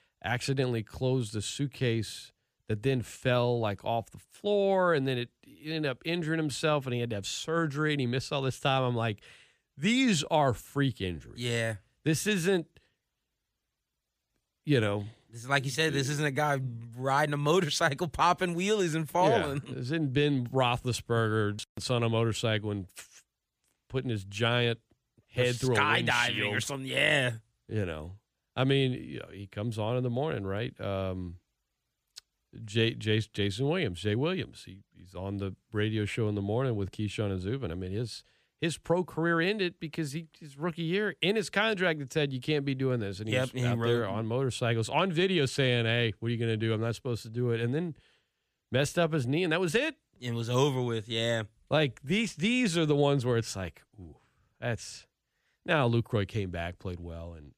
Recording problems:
none

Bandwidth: 15 kHz